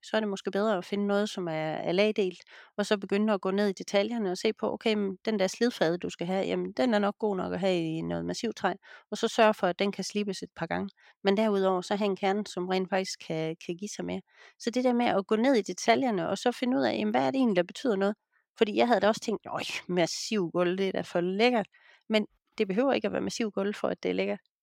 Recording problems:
none

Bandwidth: 16.5 kHz